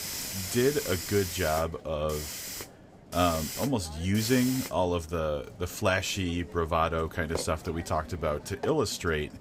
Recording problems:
hiss; loud; throughout; 8 dB below the speech

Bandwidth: 15.5 kHz